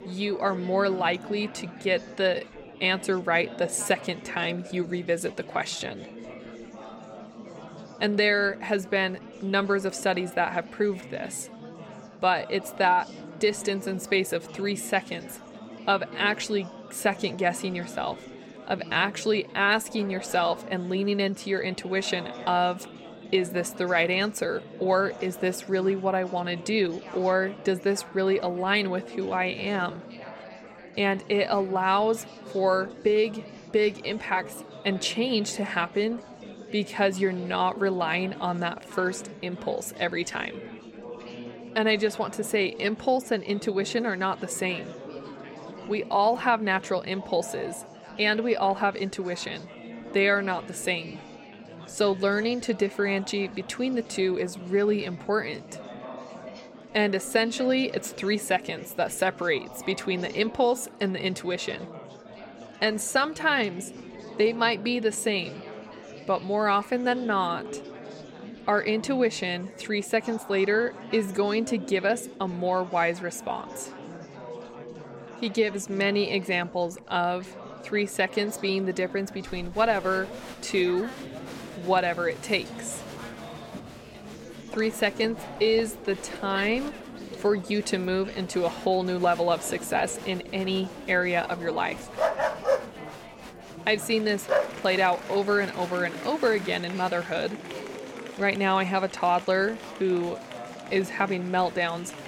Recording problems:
murmuring crowd; noticeable; throughout; 15 dB below the speech
dog barking; loud; from 1:32 to 1:35; peak 1 dB above the speech

